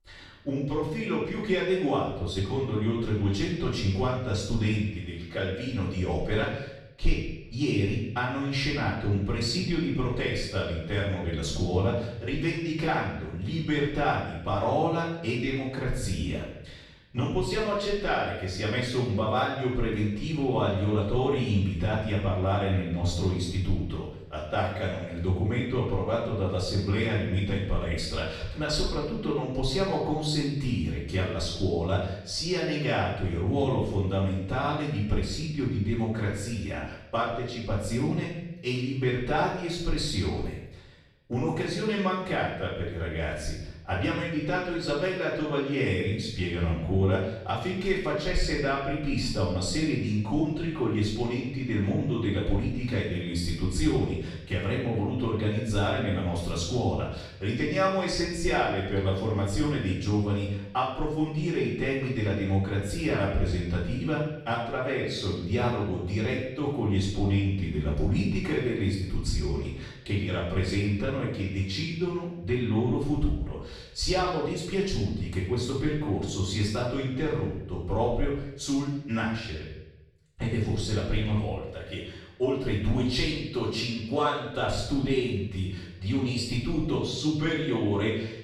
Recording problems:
off-mic speech; far
room echo; noticeable; dies away in 0.8 s

